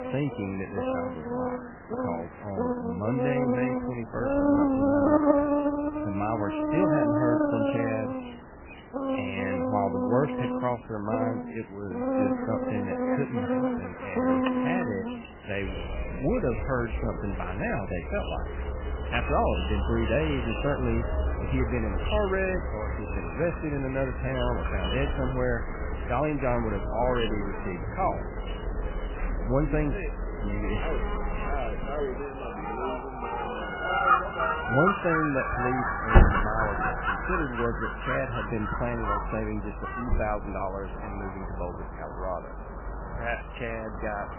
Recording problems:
garbled, watery; badly; nothing above 3 kHz
animal sounds; very loud; throughout; 2 dB above the speech
alarm; noticeable; at 14 s; peak 6 dB below the speech

